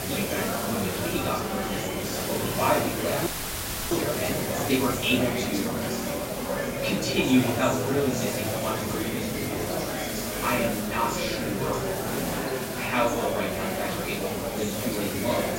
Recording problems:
off-mic speech; far
room echo; noticeable; dies away in 0.4 s
murmuring crowd; loud; throughout; 1 dB below the speech
hiss; loud; throughout; 6 dB below the speech
audio freezing; at 3.5 s for 0.5 s

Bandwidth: 16 kHz